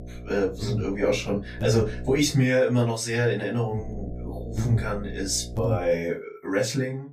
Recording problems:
off-mic speech; far
room echo; very slight; dies away in 0.2 s
electrical hum; noticeable; until 2 s and from 4 to 6 s; 60 Hz, 15 dB below the speech

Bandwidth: 14.5 kHz